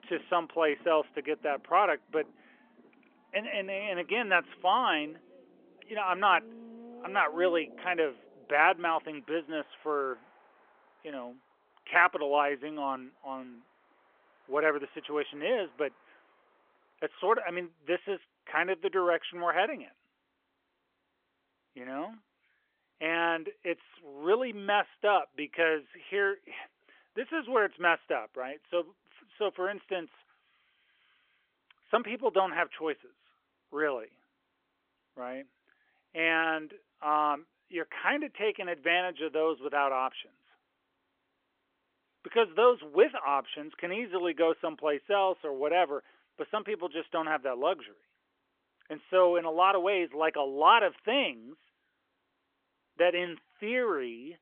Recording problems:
phone-call audio; nothing above 3.5 kHz
traffic noise; faint; until 18 s; 25 dB below the speech

